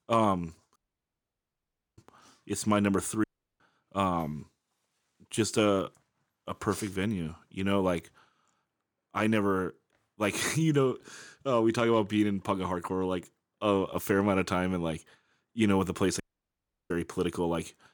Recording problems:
audio cutting out; at 1 s for 1 s, at 3 s and at 16 s for 0.5 s

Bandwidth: 18.5 kHz